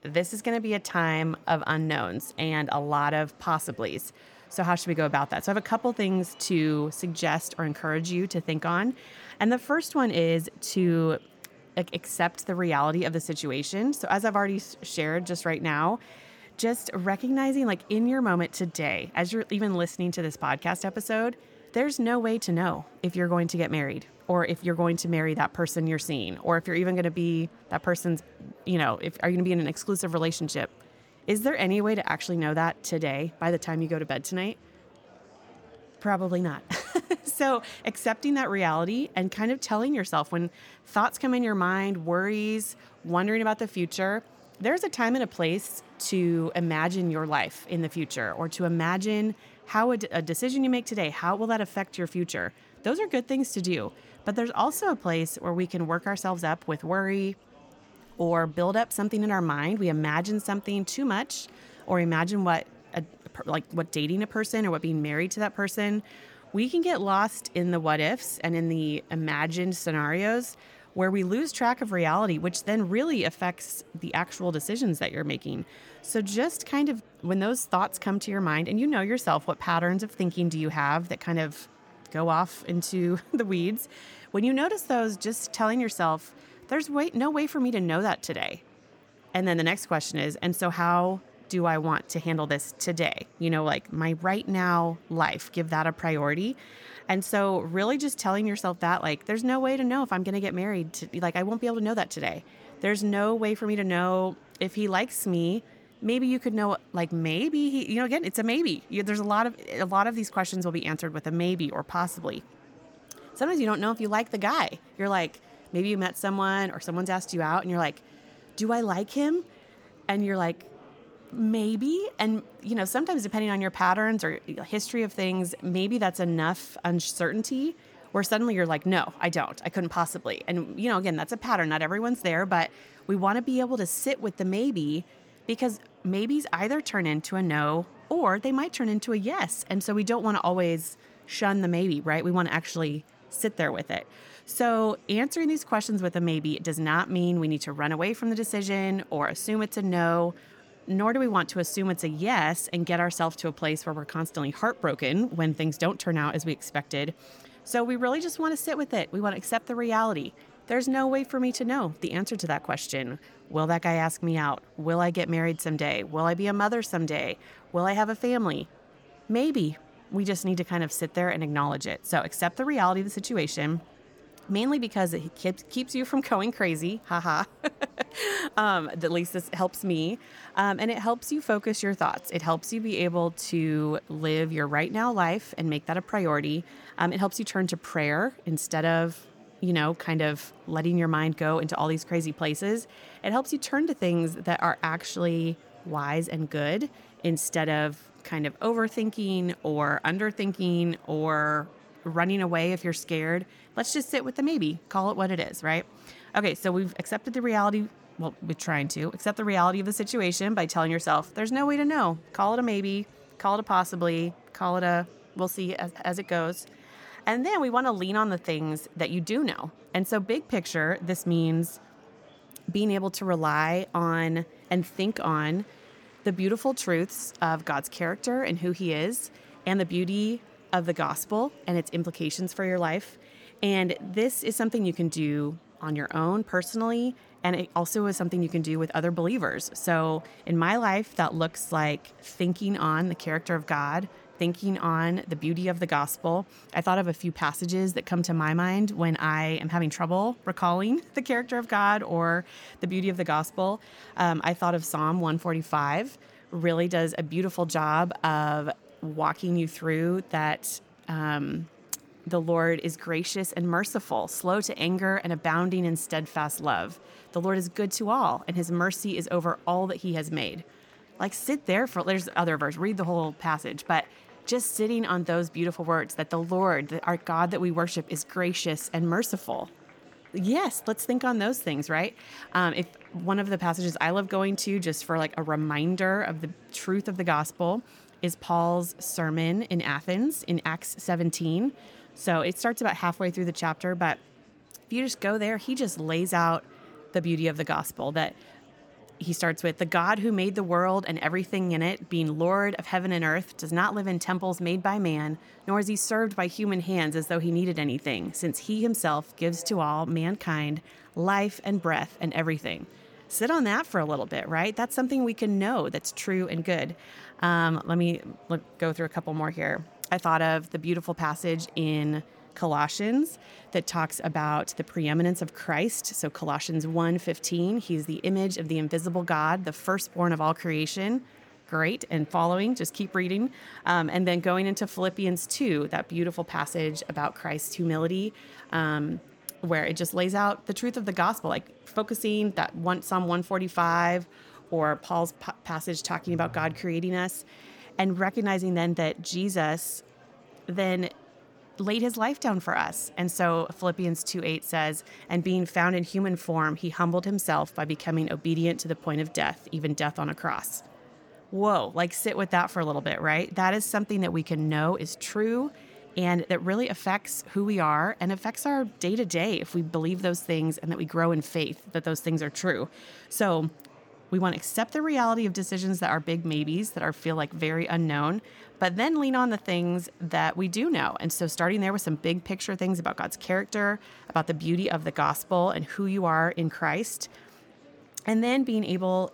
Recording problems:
murmuring crowd; faint; throughout; 25 dB below the speech

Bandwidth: 18.5 kHz